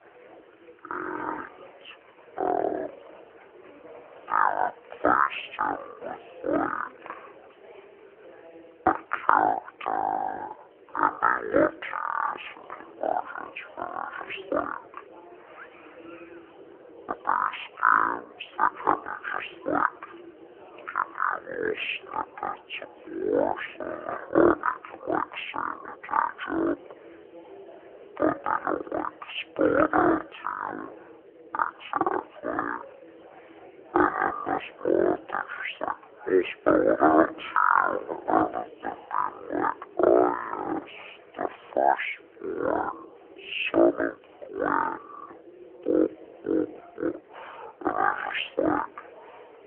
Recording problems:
phone-call audio; poor line; nothing above 3 kHz
wrong speed and pitch; too slow and too low; 0.5 times normal speed
chatter from many people; faint; throughout; 20 dB below the speech

